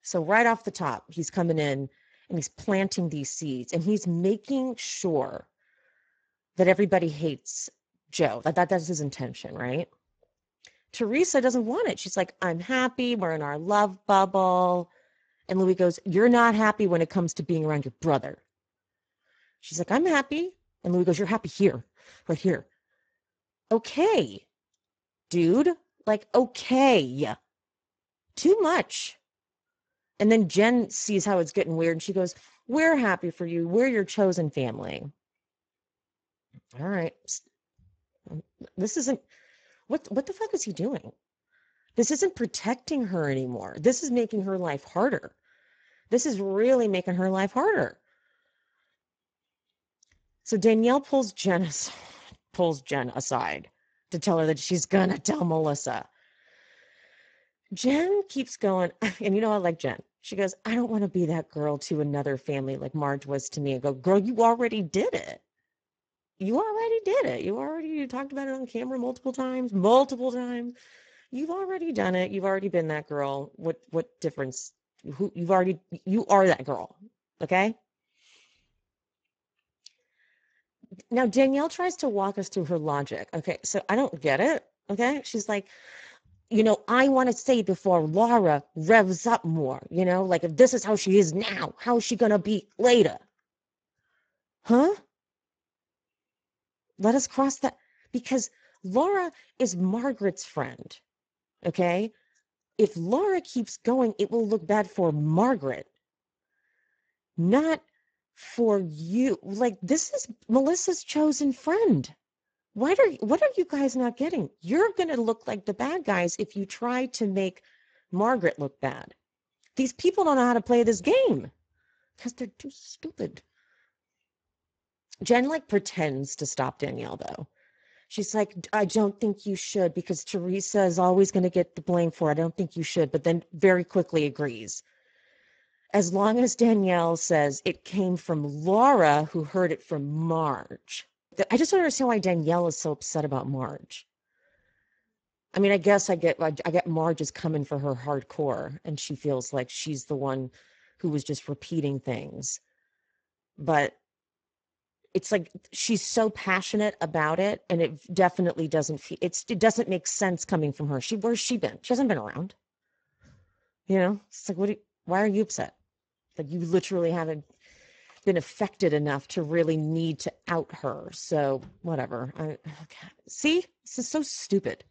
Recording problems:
garbled, watery; badly; nothing above 7.5 kHz

